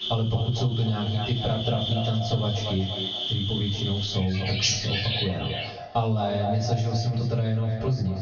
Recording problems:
echo of what is said; strong; throughout; 240 ms later, 10 dB below the speech
off-mic speech; far
room echo; slight; dies away in 0.3 s
garbled, watery; slightly; nothing above 6.5 kHz
squashed, flat; somewhat
animal sounds; loud; until 5 s; 3 dB below the speech

